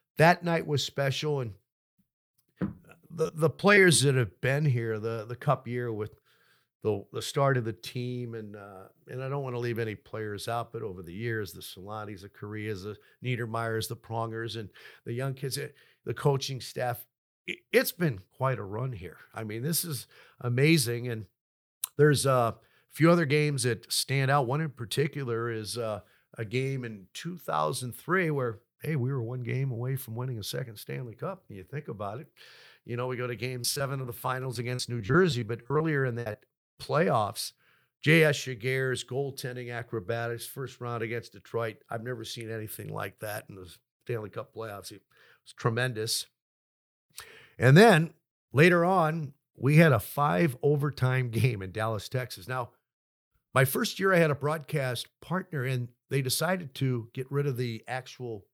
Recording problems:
choppy; very; at 3 s and from 34 to 36 s; 15% of the speech affected

